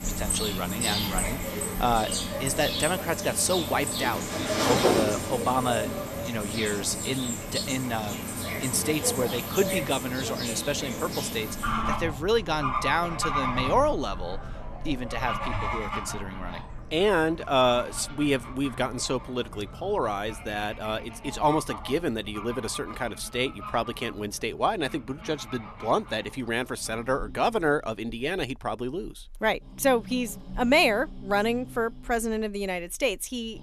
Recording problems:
animal sounds; loud; throughout; 3 dB below the speech

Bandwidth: 13.5 kHz